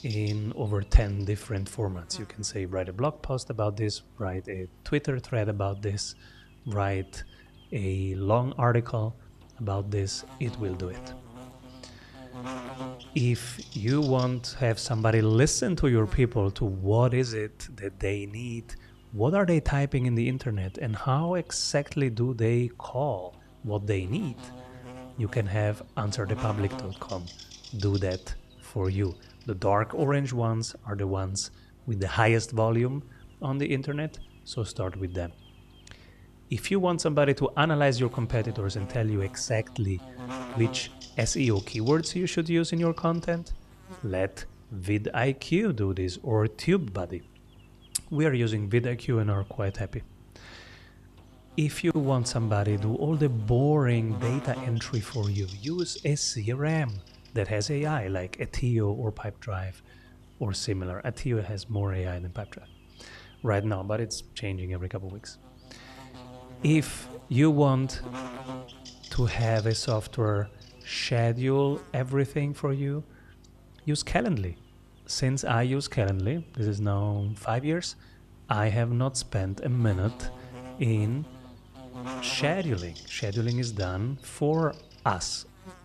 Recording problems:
electrical hum; noticeable; throughout; 50 Hz, 15 dB below the speech

